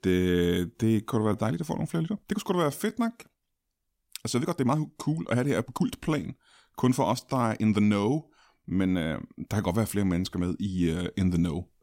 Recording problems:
uneven, jittery; strongly; from 0.5 to 11 s

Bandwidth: 16 kHz